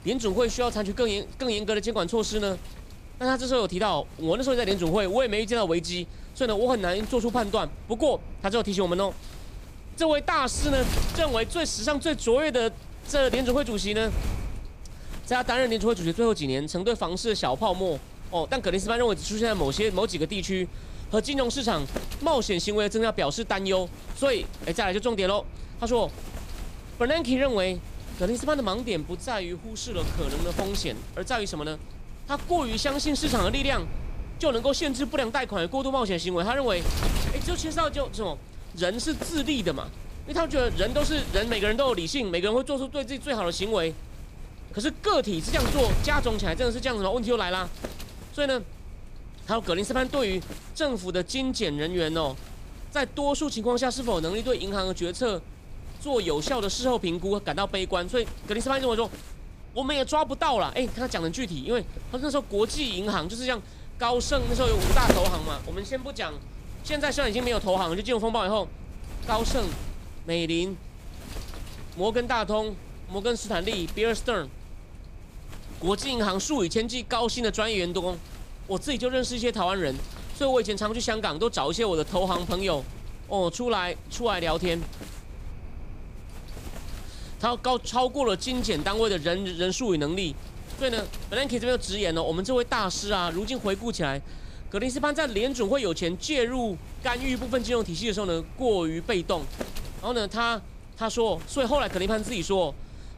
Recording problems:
wind noise on the microphone; occasional gusts; 15 dB below the speech

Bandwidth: 15 kHz